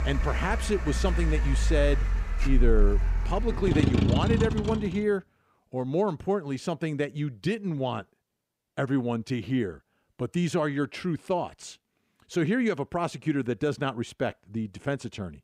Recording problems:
traffic noise; very loud; until 5 s; 2 dB above the speech

